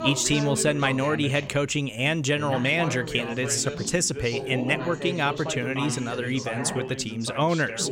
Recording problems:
background chatter; loud; throughout; 2 voices, 8 dB below the speech

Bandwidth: 16 kHz